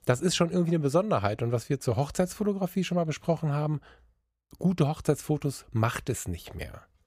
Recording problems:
none

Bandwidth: 15 kHz